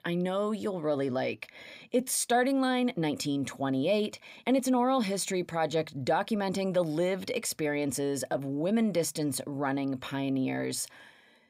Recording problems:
uneven, jittery; slightly; from 1.5 to 8.5 s

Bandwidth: 15.5 kHz